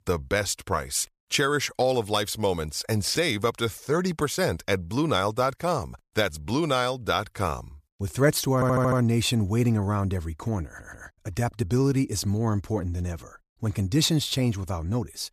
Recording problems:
audio stuttering; at 8.5 s and at 11 s

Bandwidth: 14.5 kHz